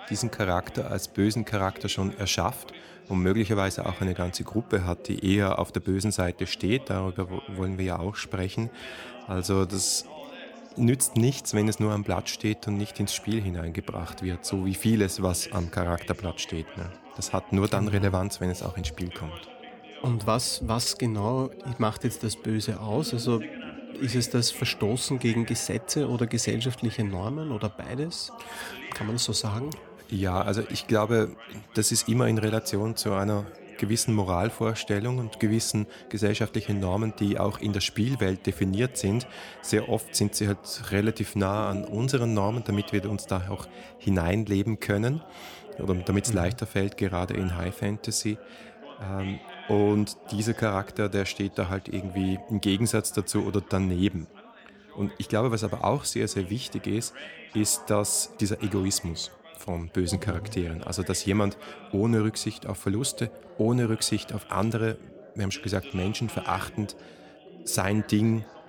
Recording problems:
background chatter; noticeable; throughout; 3 voices, 20 dB below the speech

